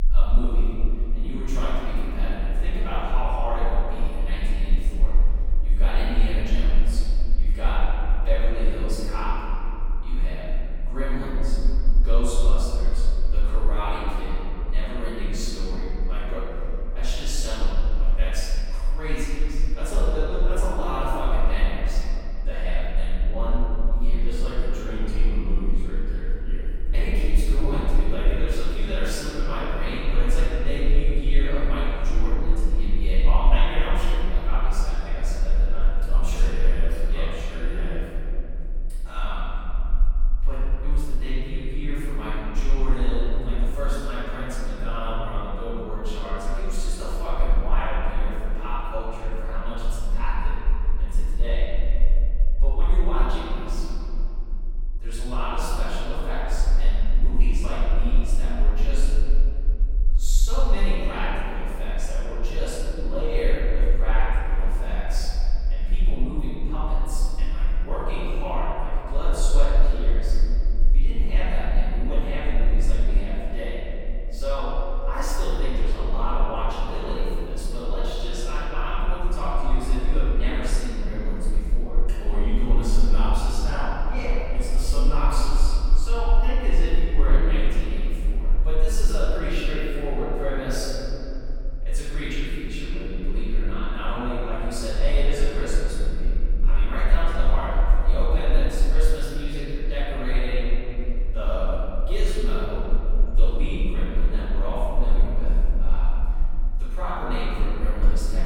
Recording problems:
room echo; strong; dies away in 3 s
off-mic speech; far
low rumble; faint; throughout; 20 dB below the speech

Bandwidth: 17 kHz